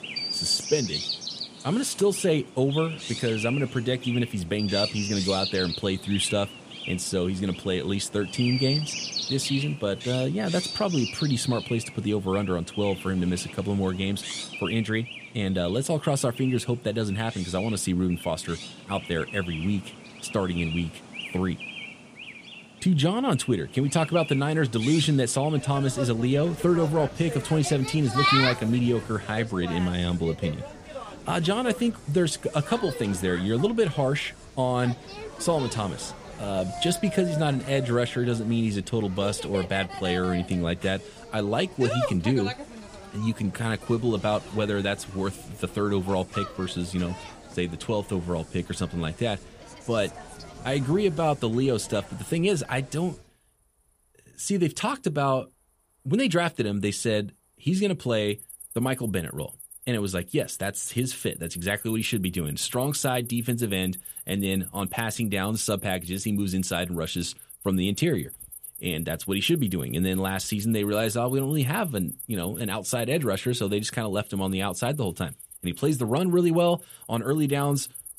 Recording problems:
animal sounds; loud; throughout; 9 dB below the speech

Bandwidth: 15 kHz